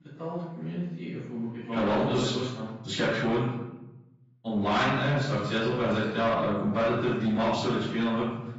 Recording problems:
room echo; strong; dies away in 0.9 s
off-mic speech; far
garbled, watery; badly; nothing above 7.5 kHz
distortion; slight; 10 dB below the speech

